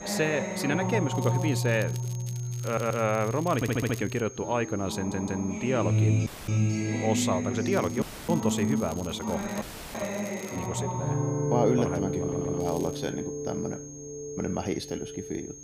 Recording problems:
background music; loud; throughout; 1 dB below the speech
high-pitched whine; noticeable; throughout; 6.5 kHz, 15 dB below the speech
crackling; noticeable; from 1 to 4 s, from 7.5 to 11 s and at 13 s; 20 dB below the speech
audio stuttering; 4 times, first at 2.5 s
audio cutting out; at 6.5 s, at 8 s and at 9.5 s

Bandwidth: 15 kHz